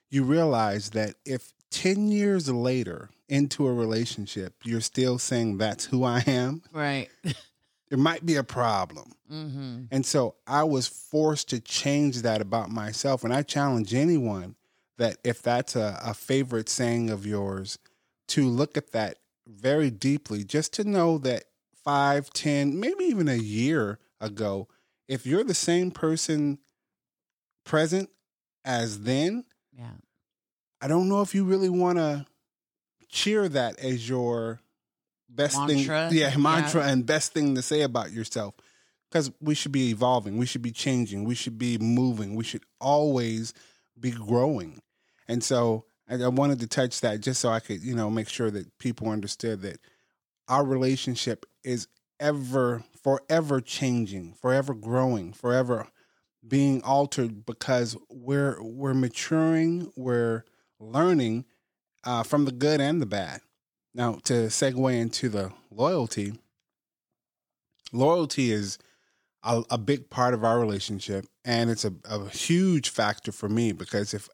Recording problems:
none

